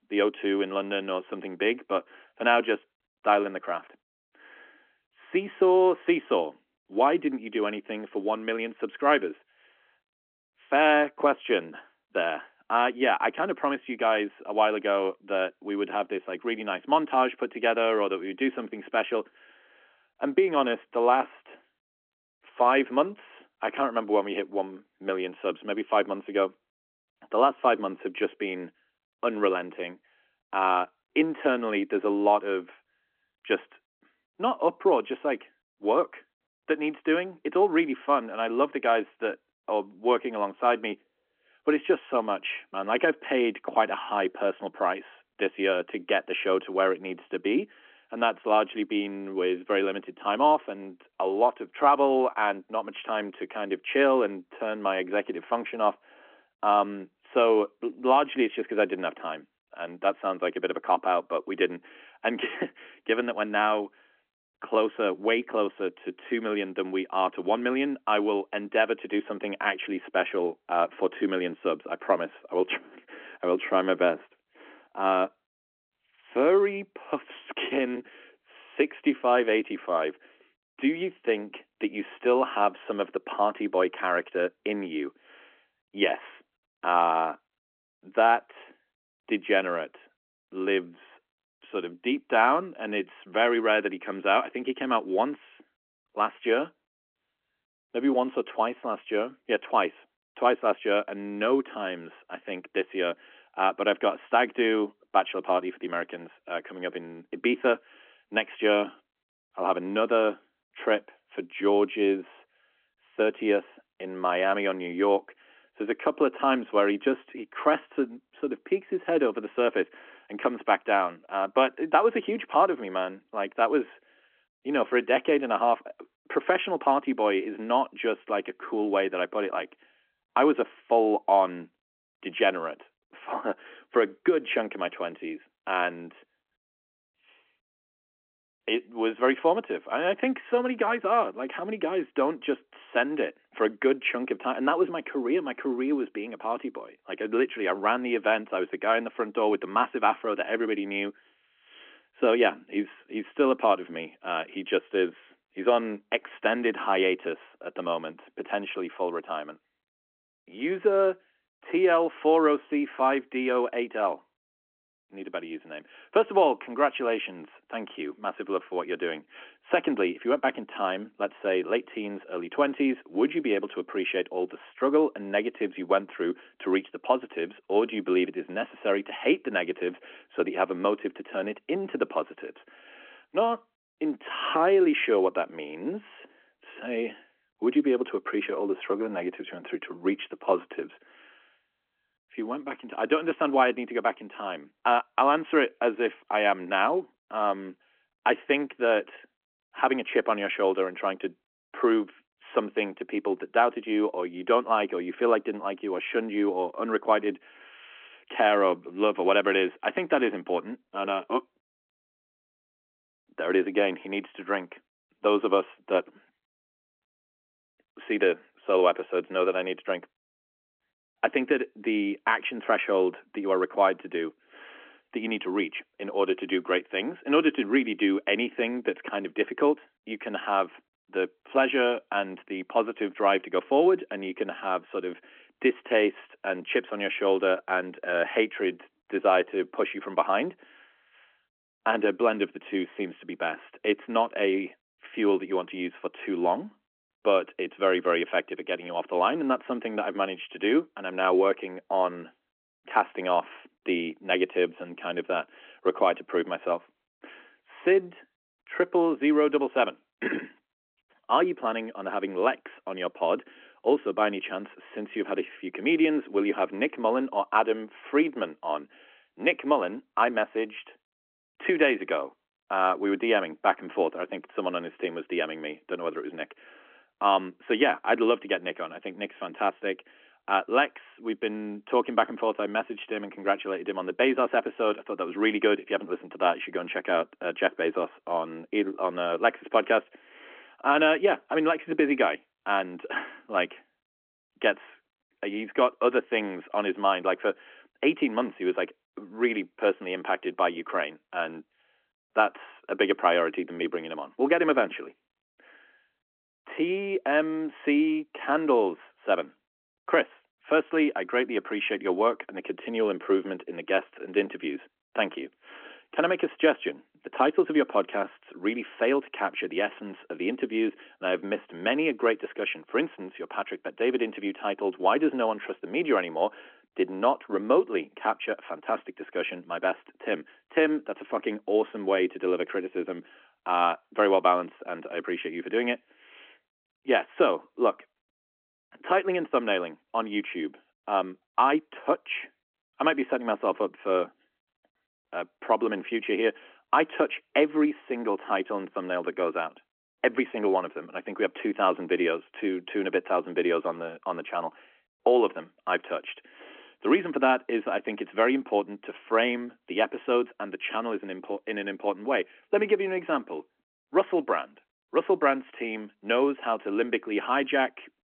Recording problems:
phone-call audio; nothing above 3.5 kHz

